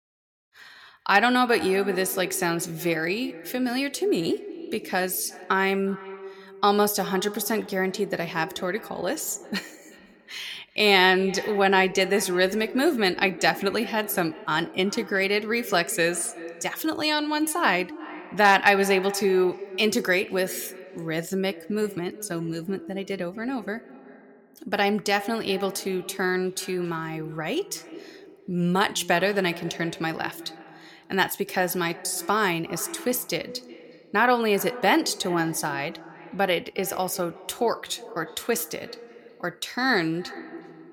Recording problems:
echo of what is said; noticeable; throughout; 360 ms later, 15 dB below the speech

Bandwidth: 17 kHz